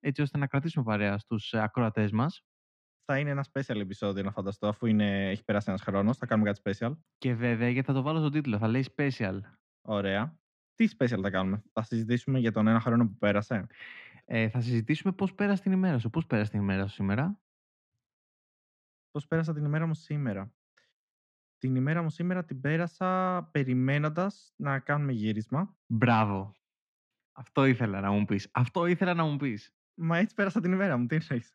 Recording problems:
muffled; slightly; fading above 2.5 kHz

